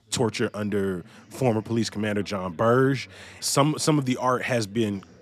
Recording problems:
background chatter; faint; throughout; 4 voices, 25 dB below the speech

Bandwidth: 14.5 kHz